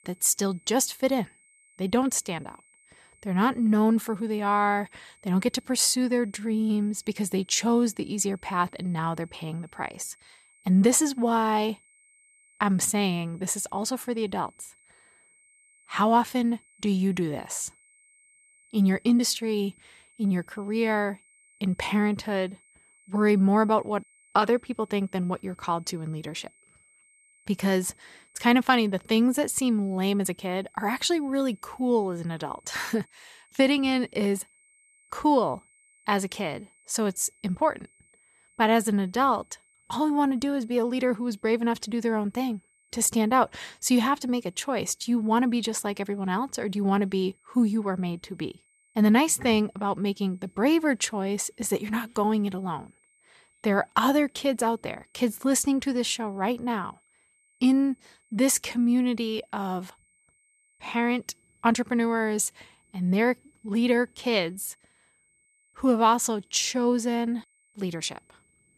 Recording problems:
high-pitched whine; faint; throughout; 2 kHz, 35 dB below the speech

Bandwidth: 14 kHz